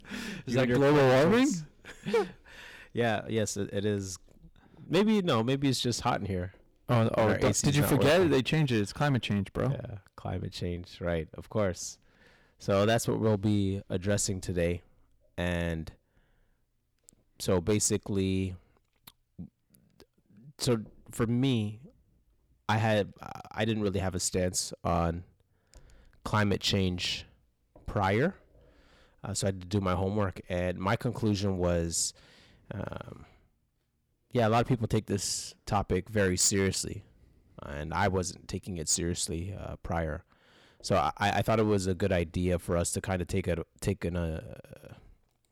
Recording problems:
distortion; heavy; 4% of the sound clipped

